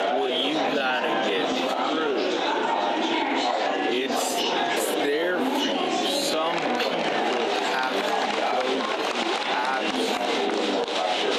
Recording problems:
wrong speed, natural pitch; too slow; 0.5 times normal speed
thin; very slightly; fading below 250 Hz
squashed, flat; somewhat
murmuring crowd; very loud; throughout; 4 dB above the speech

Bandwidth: 14.5 kHz